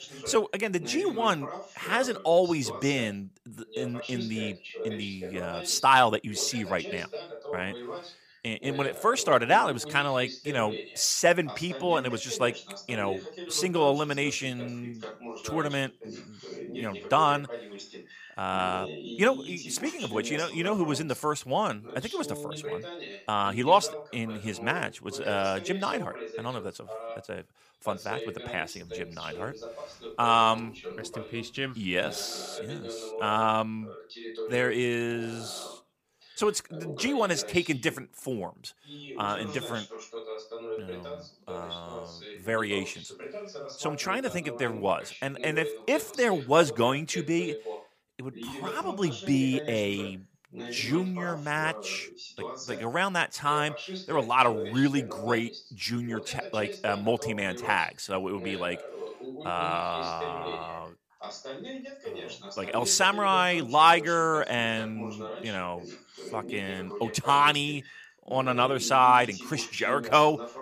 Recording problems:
voice in the background; noticeable; throughout; 15 dB below the speech

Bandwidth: 15 kHz